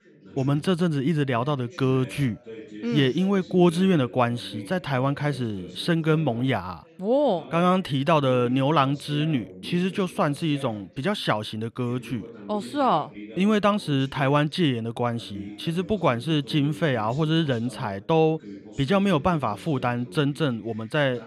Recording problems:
background chatter; noticeable; throughout; 3 voices, 20 dB below the speech

